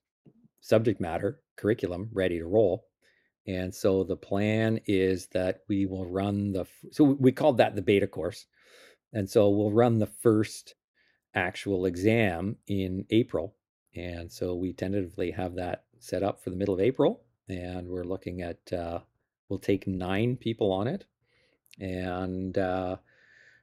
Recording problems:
none

